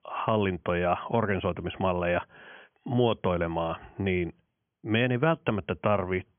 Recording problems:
high frequencies cut off; severe; nothing above 3.5 kHz

